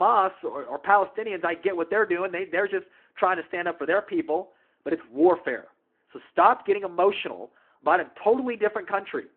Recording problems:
phone-call audio
abrupt cut into speech; at the start

